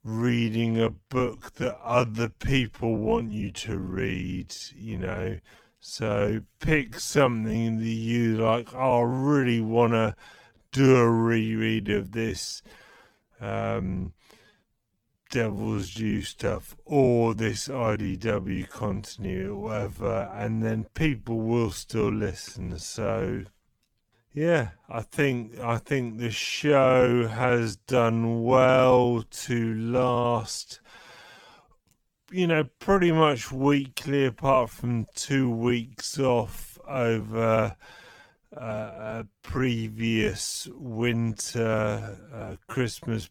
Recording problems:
wrong speed, natural pitch; too slow; 0.5 times normal speed

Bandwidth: 19 kHz